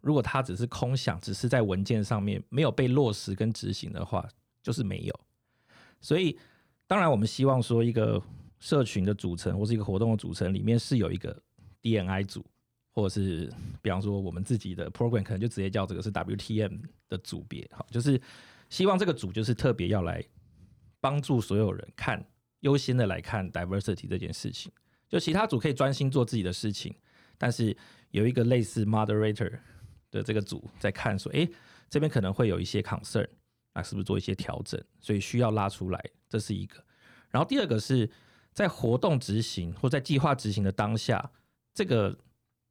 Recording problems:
none

